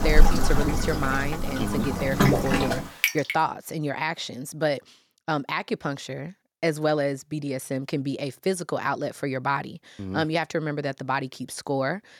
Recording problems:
rain or running water; very loud; until 3 s; 2 dB above the speech

